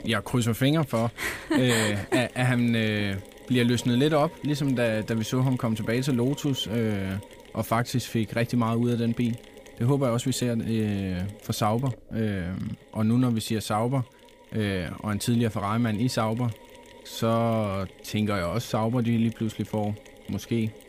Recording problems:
machinery noise; faint; throughout; 20 dB below the speech

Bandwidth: 15 kHz